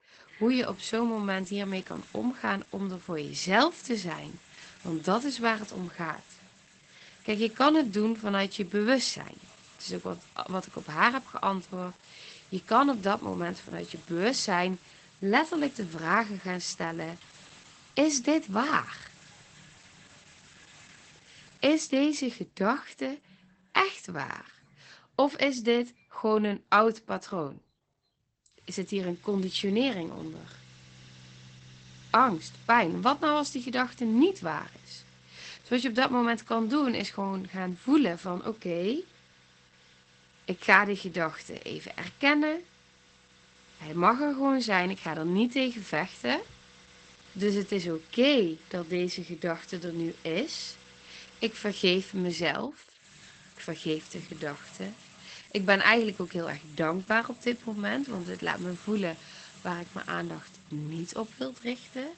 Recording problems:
garbled, watery; badly; nothing above 8 kHz
household noises; faint; throughout; 25 dB below the speech

